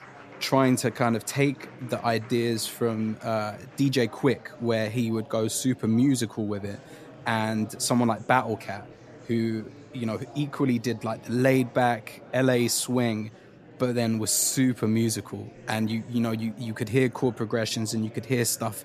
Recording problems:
murmuring crowd; faint; throughout; 20 dB below the speech

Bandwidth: 14.5 kHz